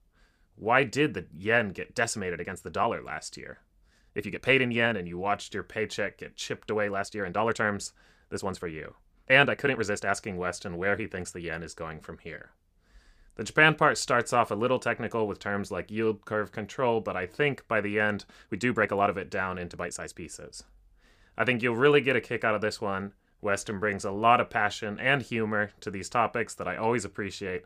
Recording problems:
uneven, jittery; strongly; from 2 to 24 s

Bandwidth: 15 kHz